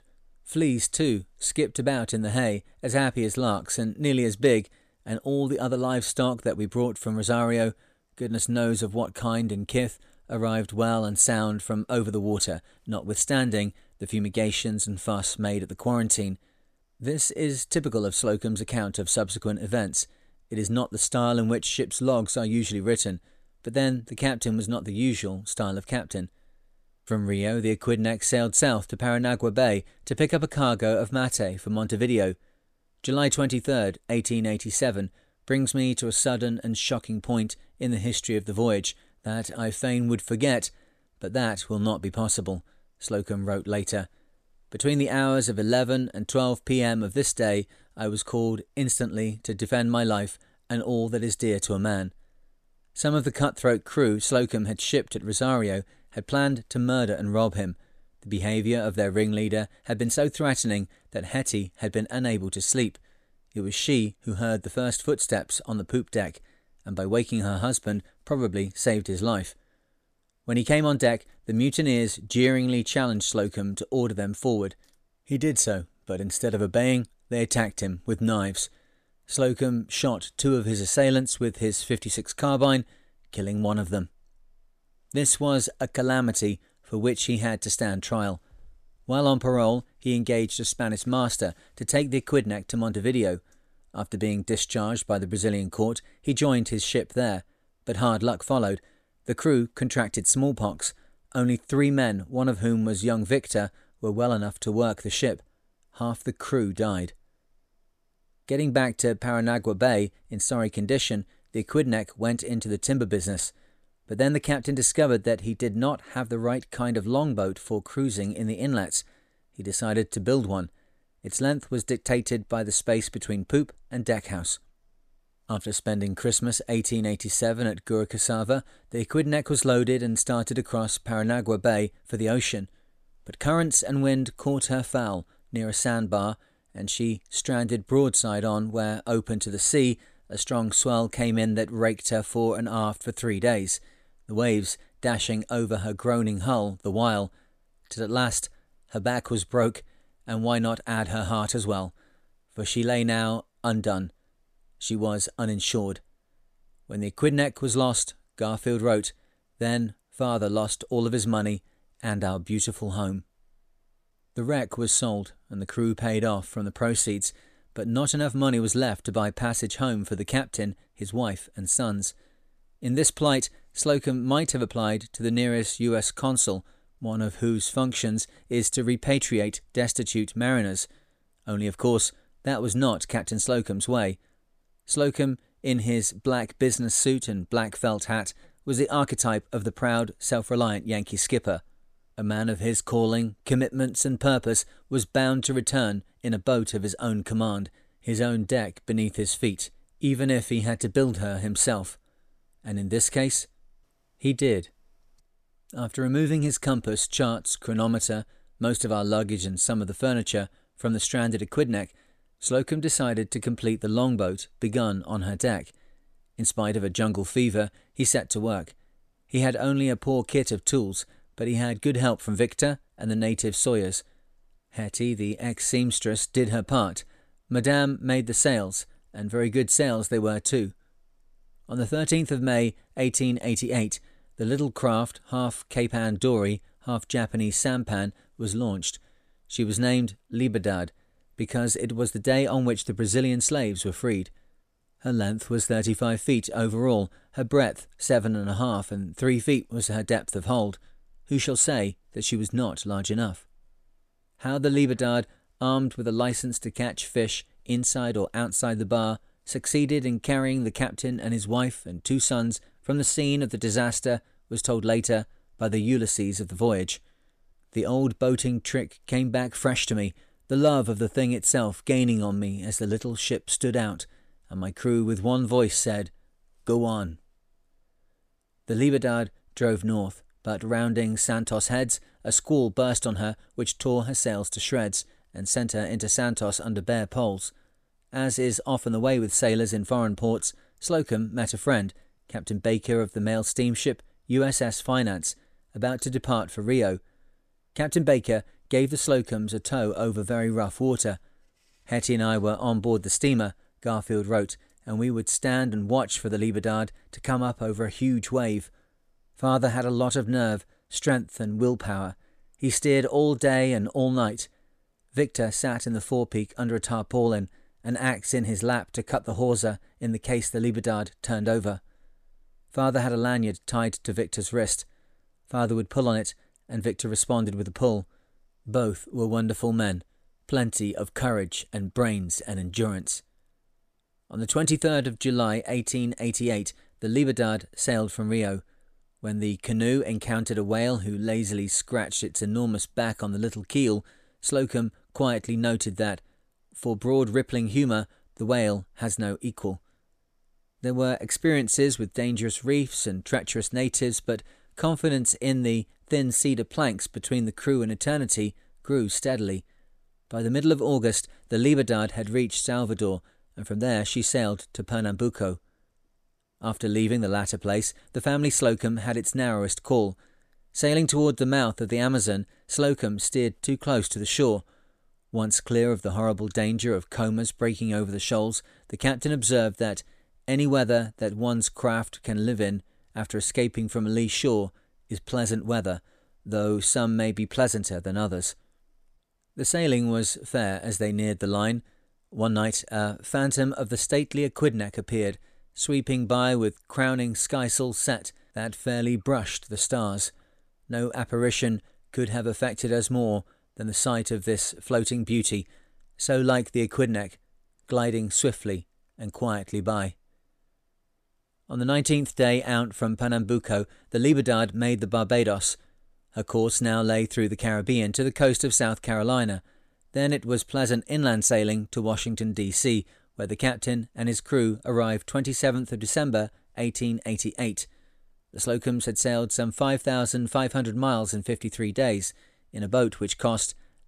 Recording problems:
none

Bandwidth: 14.5 kHz